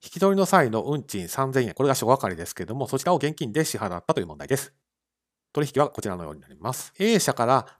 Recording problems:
uneven, jittery; strongly; from 1.5 to 7 s

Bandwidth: 14.5 kHz